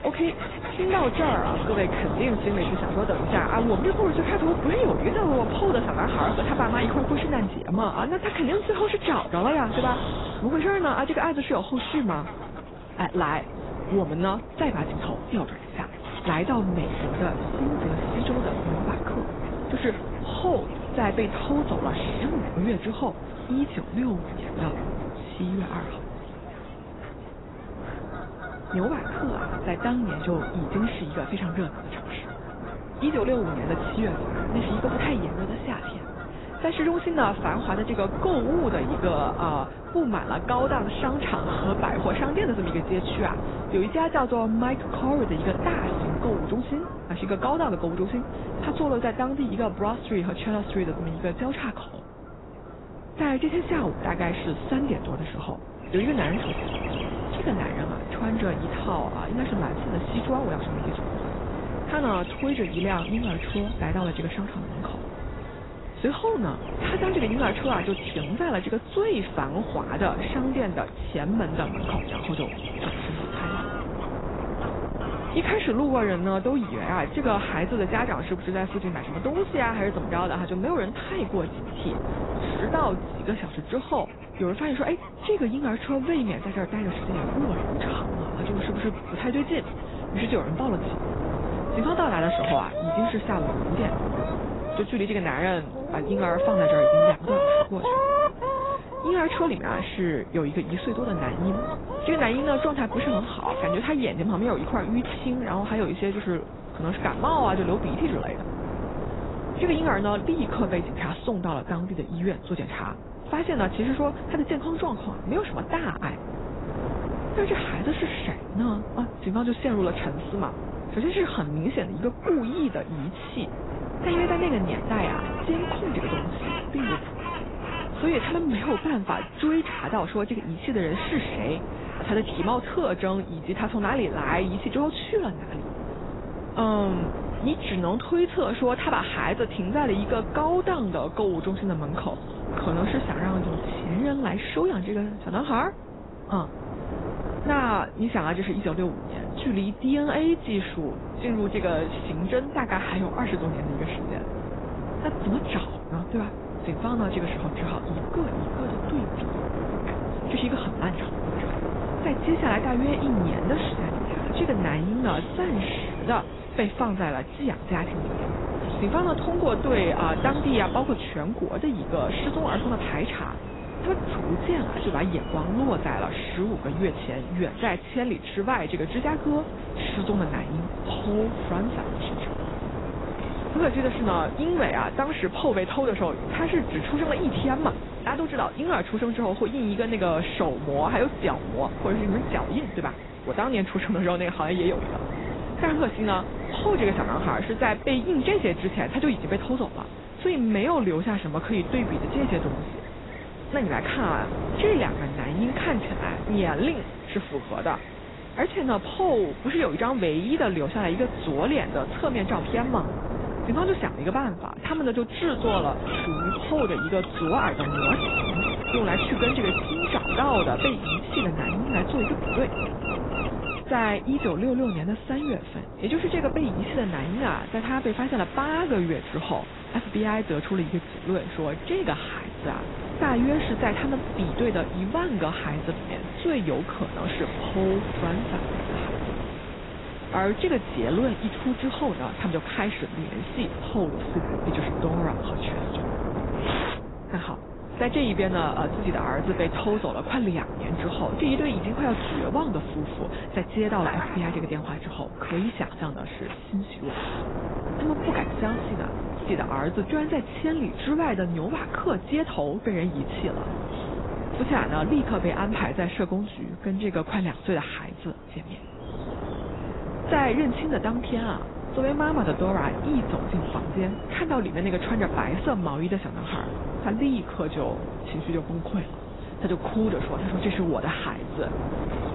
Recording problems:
garbled, watery; badly; nothing above 4 kHz
wind noise on the microphone; heavy; 8 dB below the speech
animal sounds; loud; throughout; 8 dB below the speech

